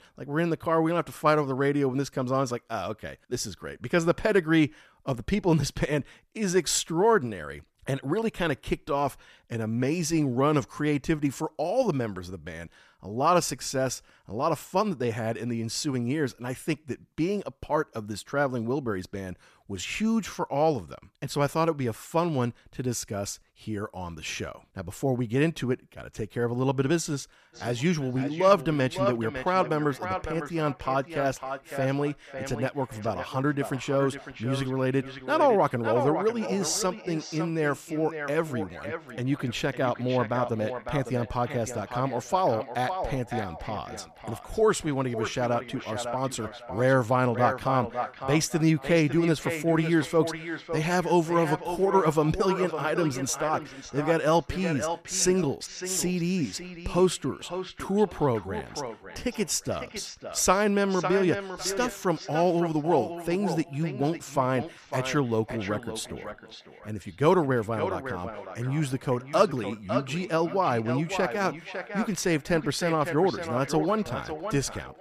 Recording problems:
echo of what is said; strong; from 28 s on; 550 ms later, 9 dB below the speech

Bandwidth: 14.5 kHz